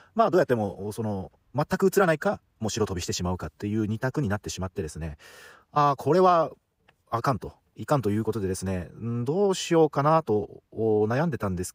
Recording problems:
wrong speed, natural pitch; too fast; 1.6 times normal speed

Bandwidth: 15.5 kHz